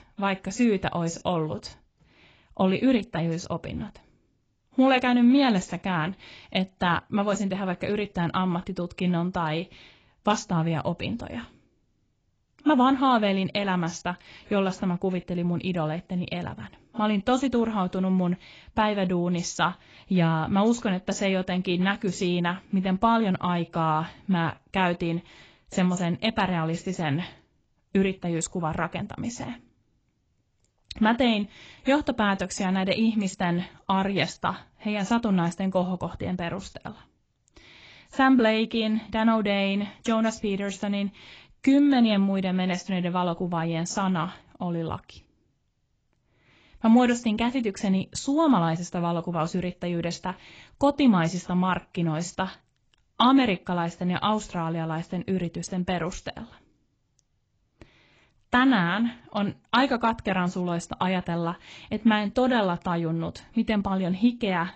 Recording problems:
garbled, watery; badly; nothing above 8 kHz

